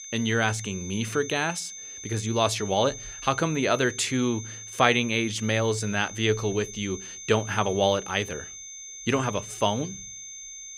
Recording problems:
high-pitched whine; noticeable; throughout; 6.5 kHz, 10 dB below the speech

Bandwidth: 15.5 kHz